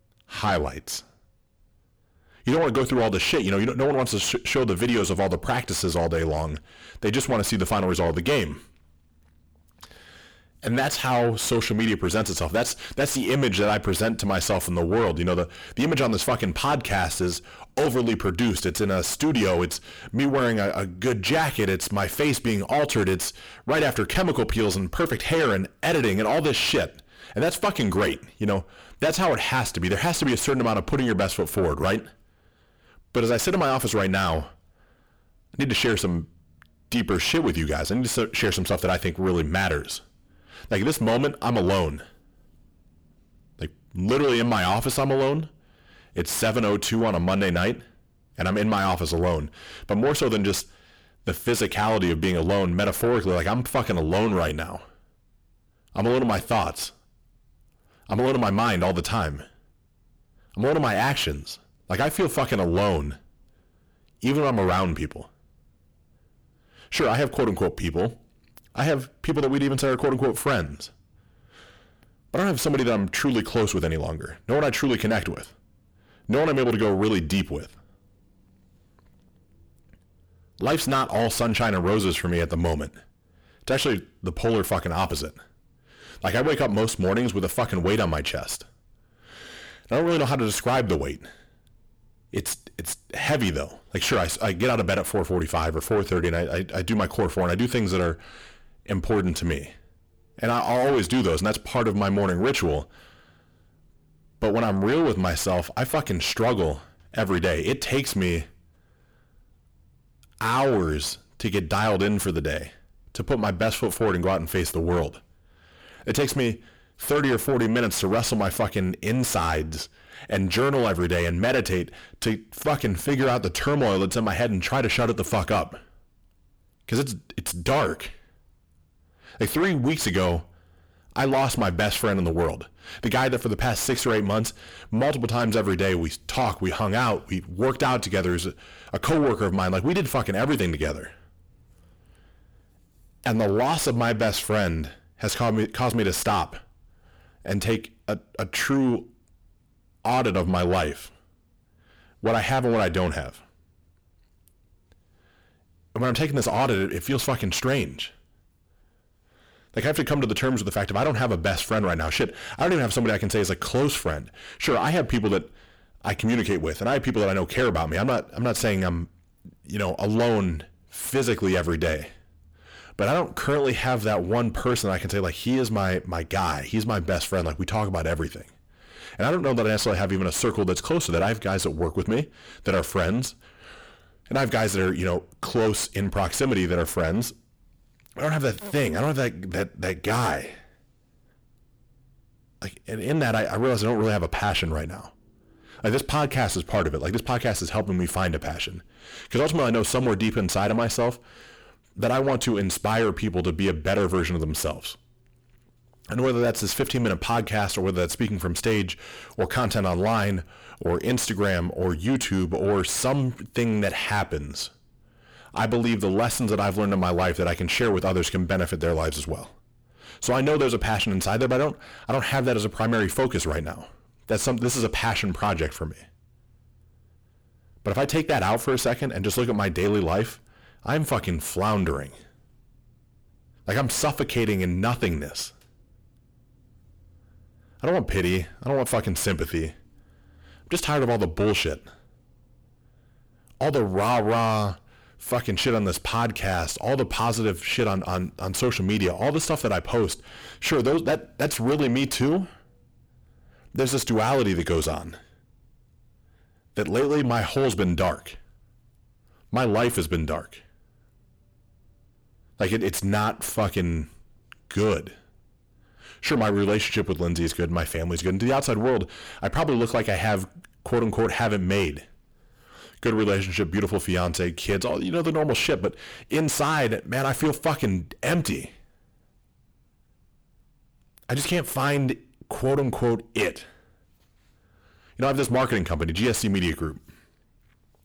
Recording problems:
distortion; heavy; 7 dB below the speech

